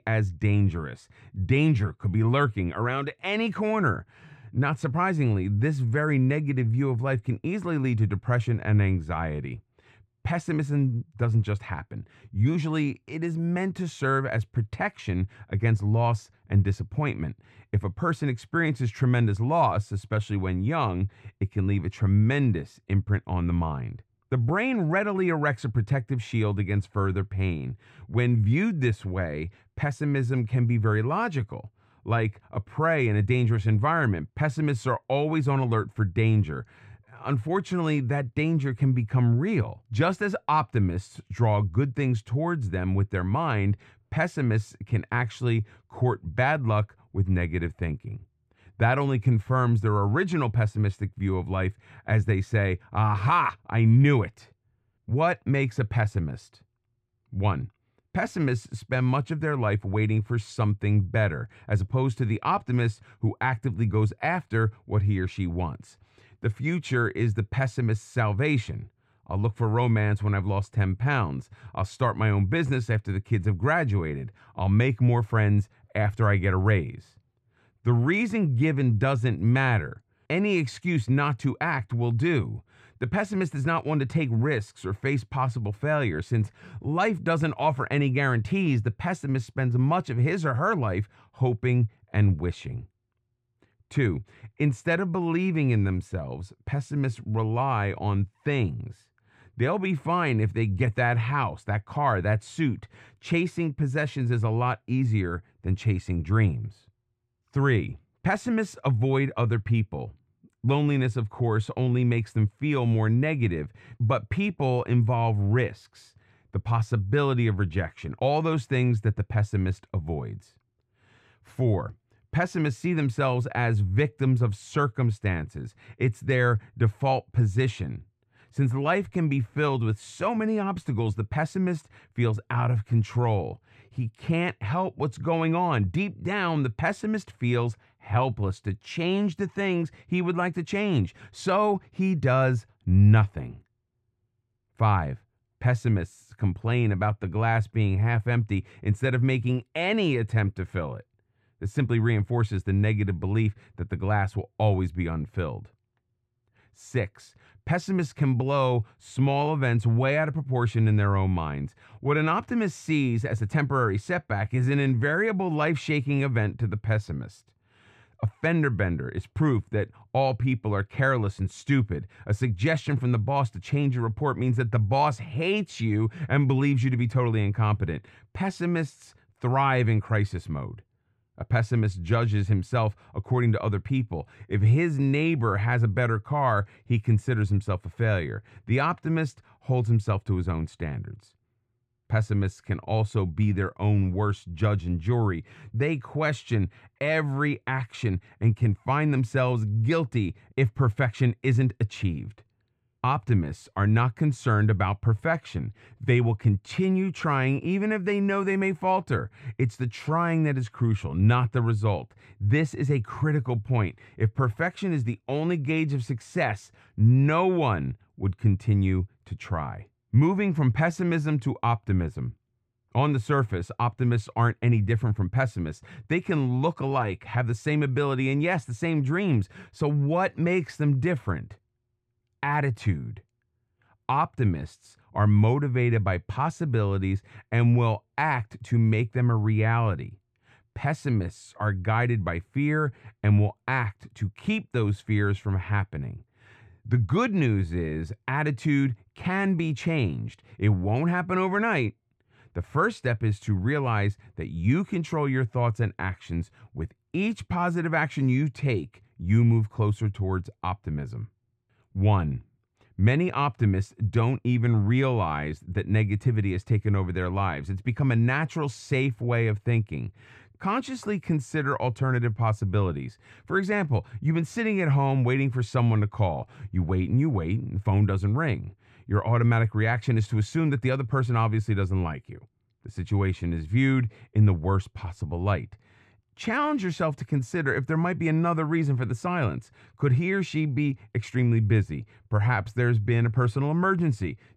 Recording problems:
muffled; very; fading above 2.5 kHz

